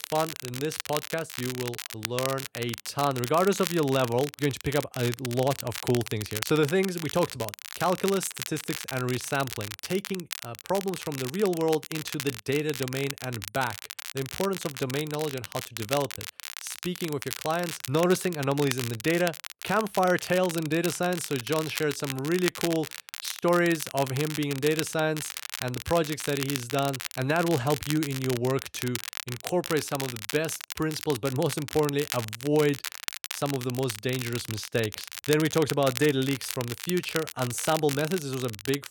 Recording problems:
crackle, like an old record; loud; 8 dB below the speech

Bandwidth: 17.5 kHz